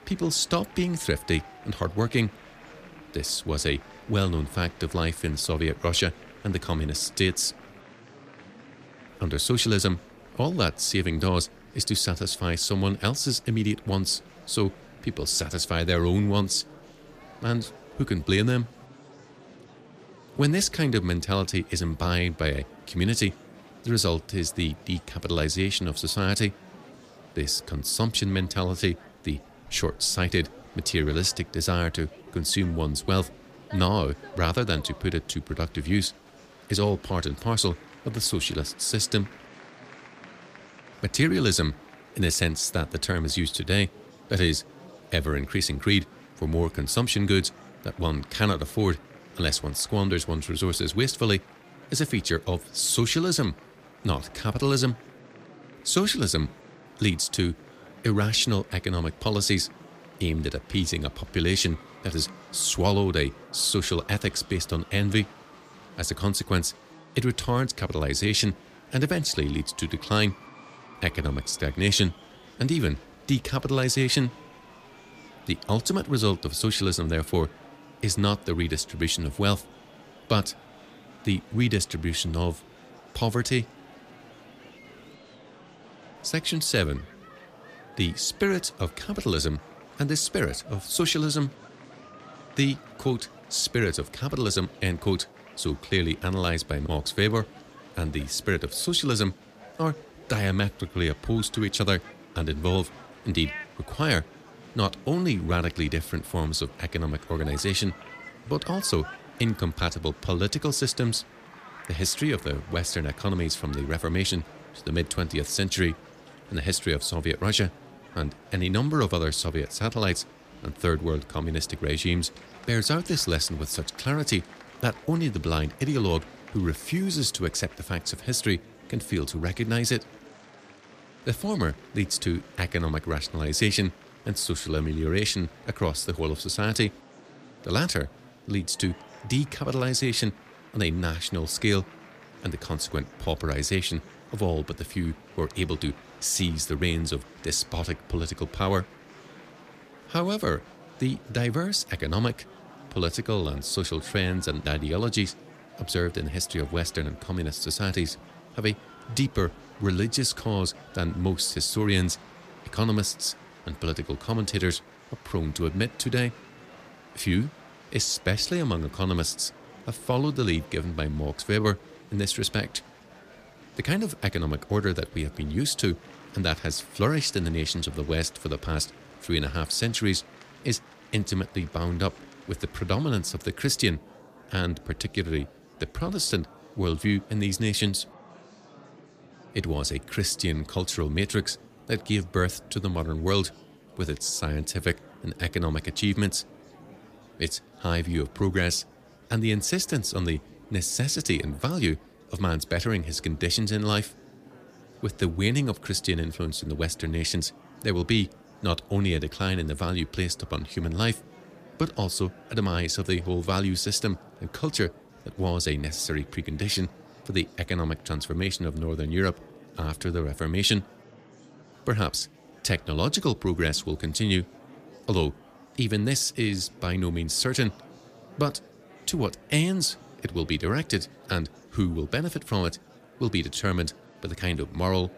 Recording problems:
murmuring crowd; faint; throughout; 20 dB below the speech

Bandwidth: 15 kHz